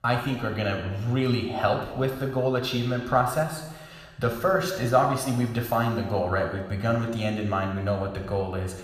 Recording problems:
room echo; noticeable; dies away in 1.1 s
off-mic speech; somewhat distant

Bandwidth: 14.5 kHz